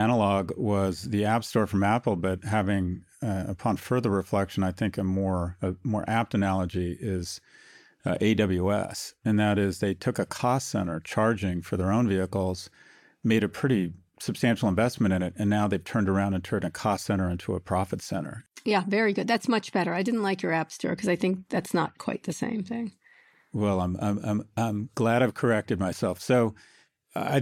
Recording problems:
abrupt cut into speech; at the start and the end

